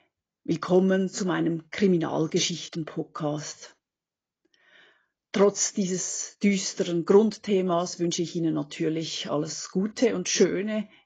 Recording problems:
garbled, watery; badly; nothing above 7.5 kHz

